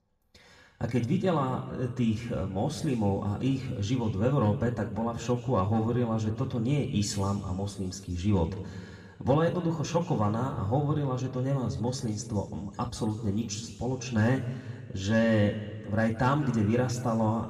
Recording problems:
room echo; slight; dies away in 1.4 s
off-mic speech; somewhat distant

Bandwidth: 15 kHz